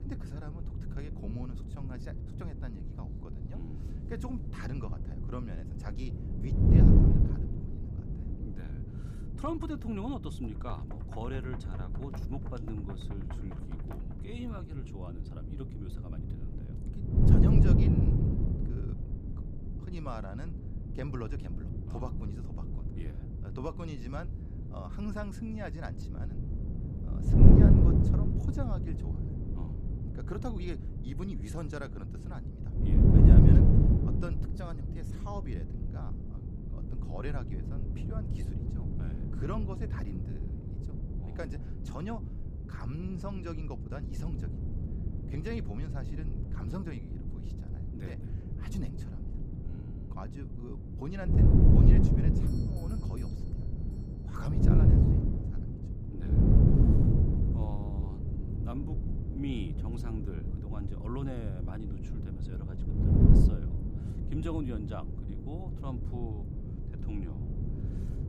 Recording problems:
wind noise on the microphone; heavy; 5 dB above the speech
door banging; noticeable; from 10 to 14 s; peak 7 dB below the speech
doorbell; faint; from 52 to 54 s; peak 15 dB below the speech

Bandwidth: 15 kHz